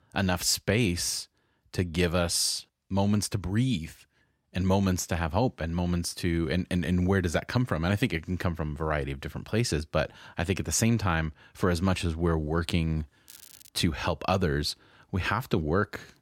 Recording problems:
crackling; faint; at 13 s, mostly in the pauses; 20 dB below the speech

